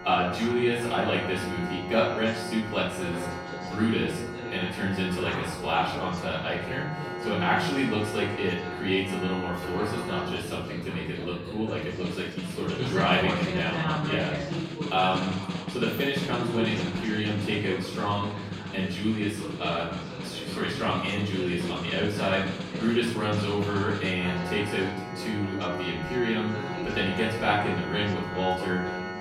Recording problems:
off-mic speech; far
room echo; noticeable; dies away in 0.7 s
background music; loud; throughout; 7 dB below the speech
chatter from many people; noticeable; throughout; 10 dB below the speech

